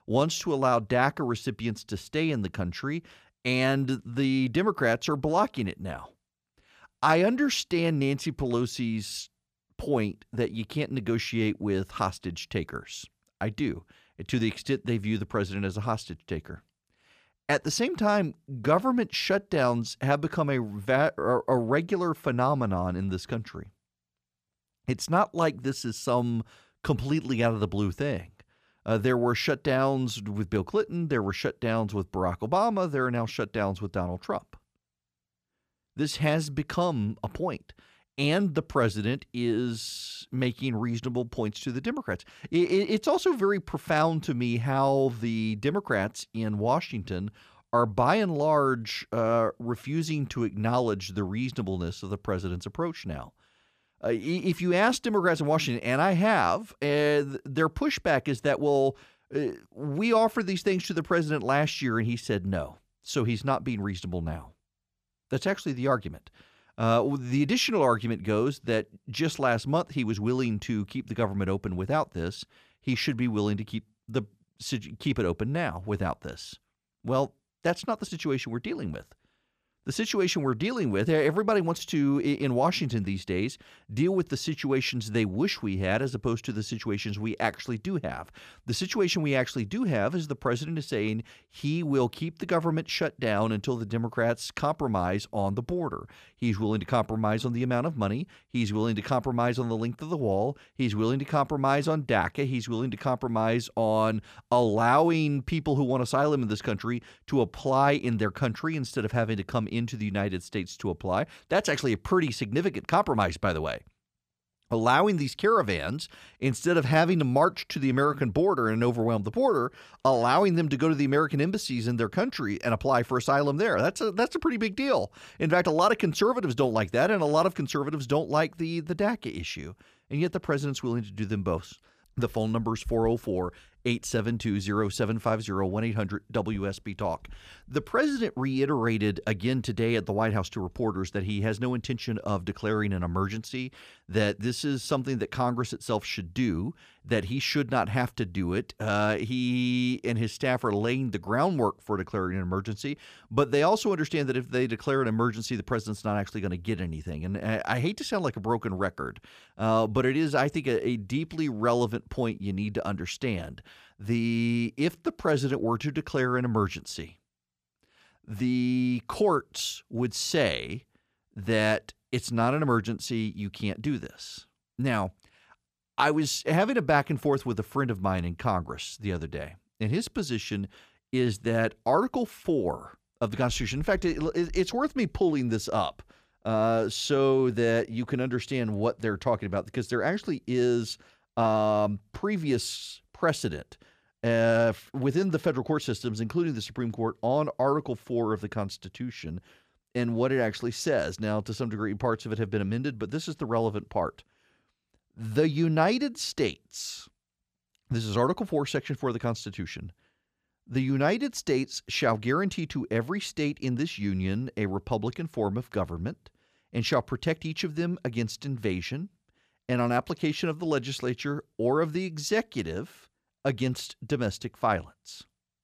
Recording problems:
none

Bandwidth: 14.5 kHz